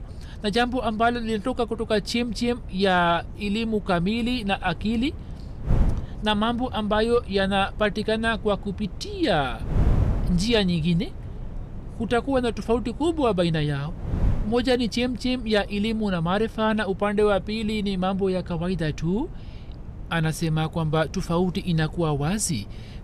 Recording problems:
wind noise on the microphone; occasional gusts; 20 dB below the speech

